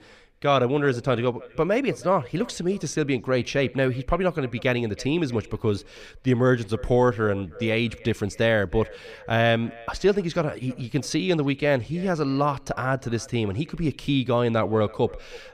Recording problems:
echo of what is said; faint; throughout; 320 ms later, 20 dB below the speech

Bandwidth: 14.5 kHz